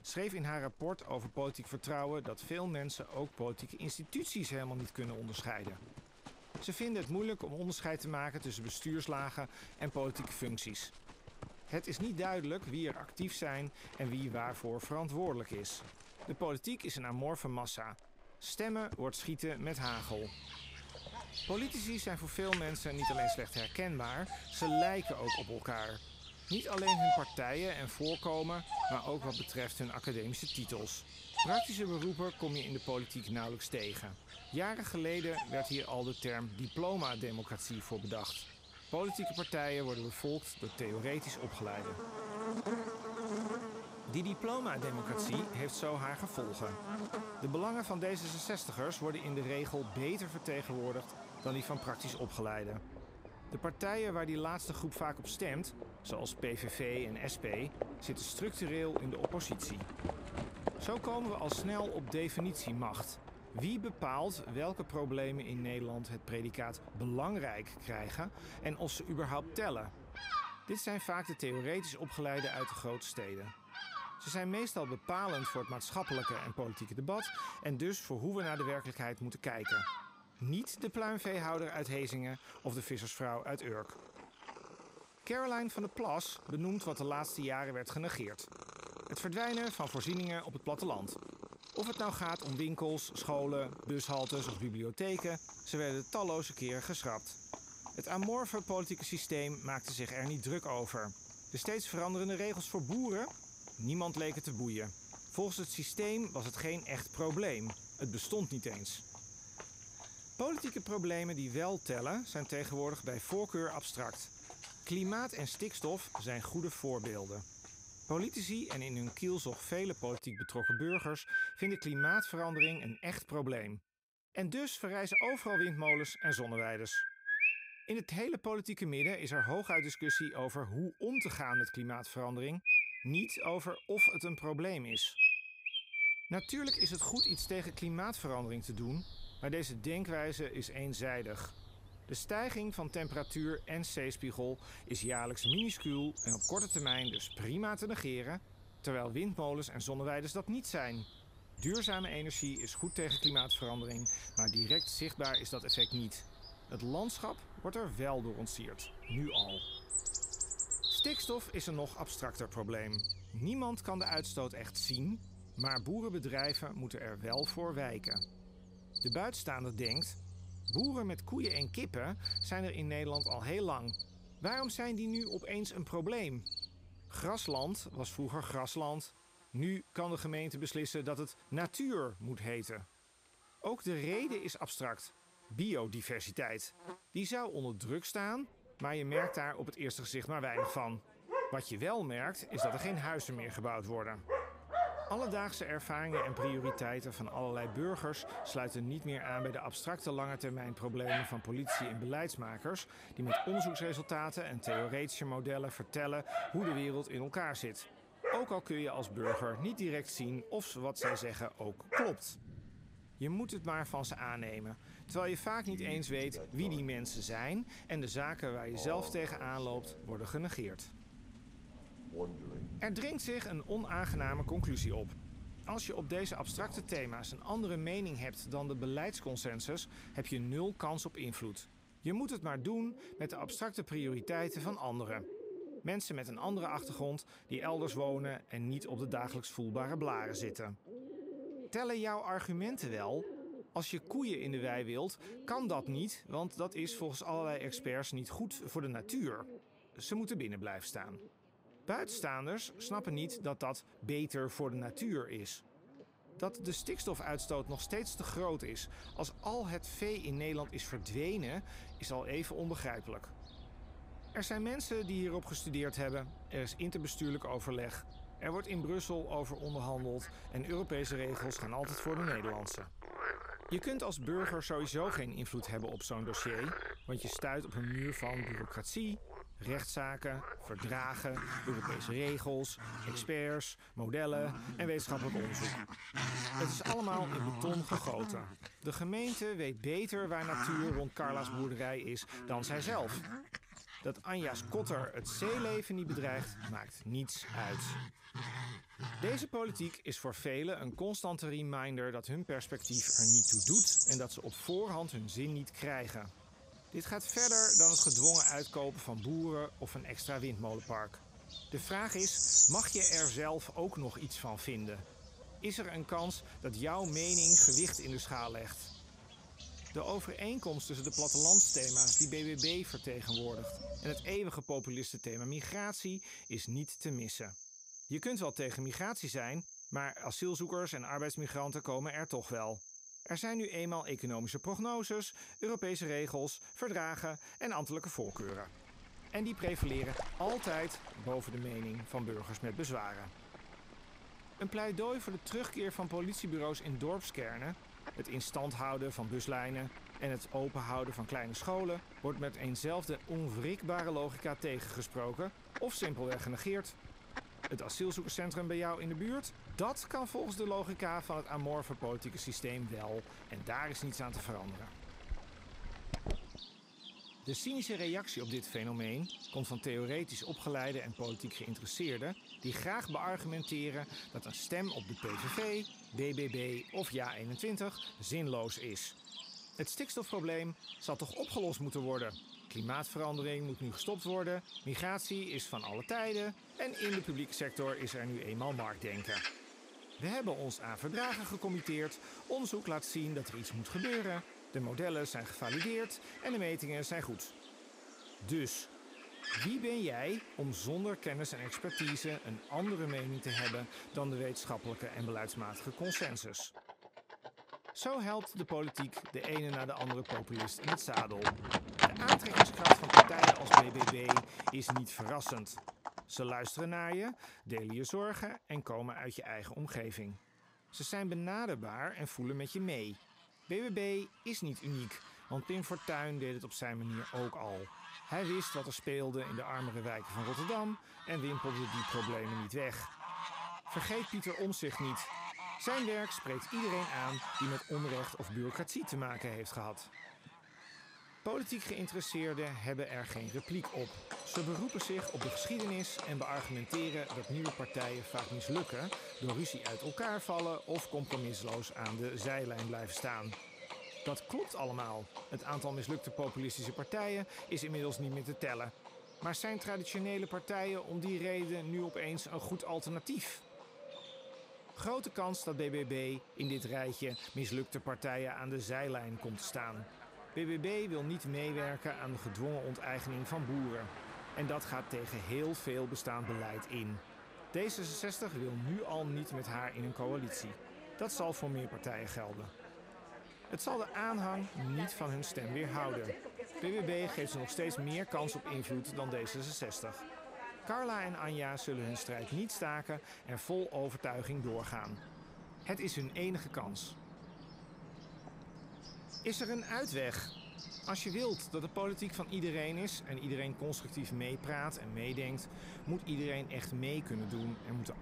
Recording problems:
animal sounds; very loud; throughout; 3 dB above the speech

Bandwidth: 15.5 kHz